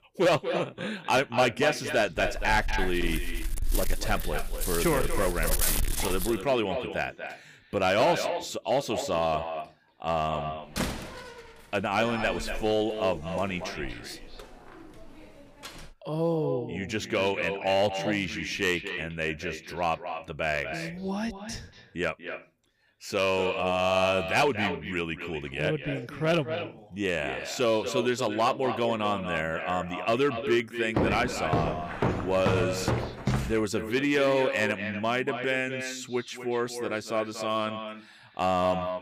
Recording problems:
echo of what is said; strong; throughout; 240 ms later, 8 dB below the speech
distortion; slight; 3% of the sound clipped
dog barking; loud; from 2 to 6.5 s; peak 3 dB above the speech
door banging; noticeable; from 11 to 16 s; peak 3 dB below the speech
footsteps; loud; from 31 to 34 s; peak 1 dB above the speech

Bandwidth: 15 kHz